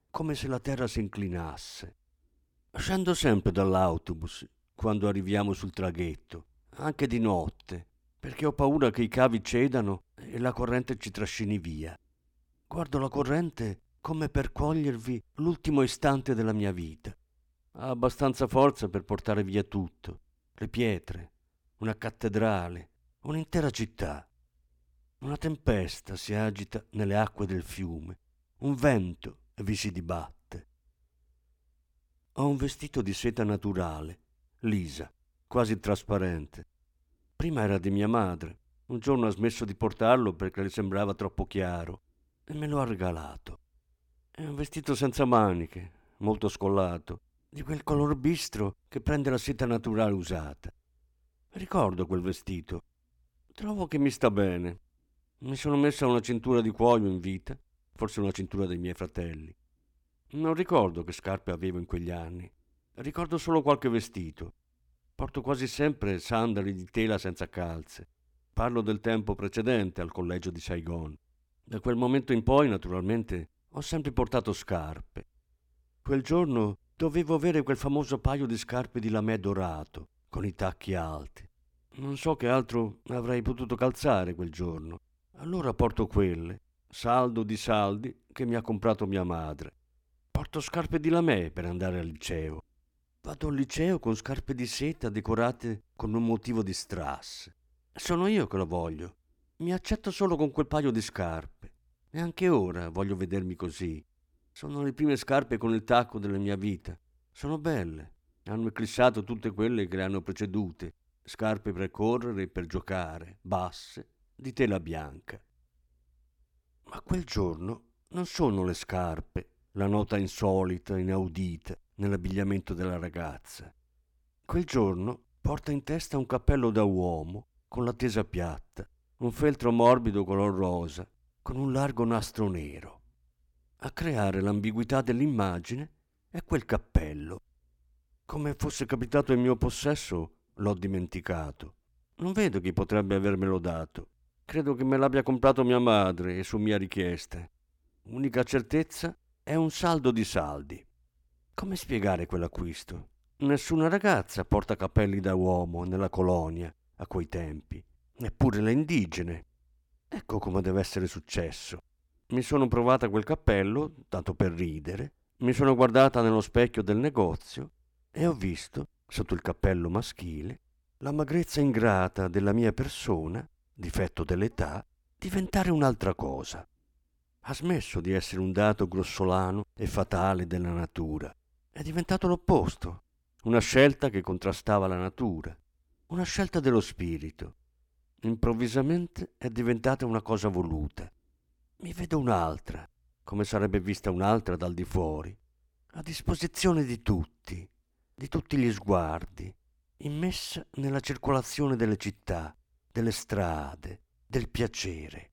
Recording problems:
none

